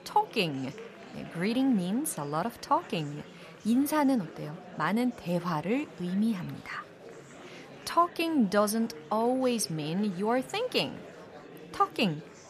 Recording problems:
murmuring crowd; noticeable; throughout; 20 dB below the speech

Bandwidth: 14.5 kHz